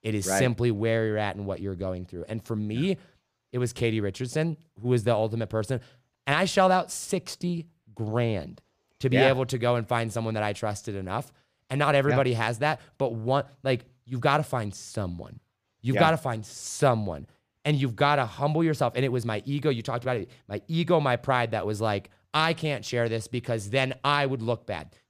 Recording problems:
none

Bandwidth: 15 kHz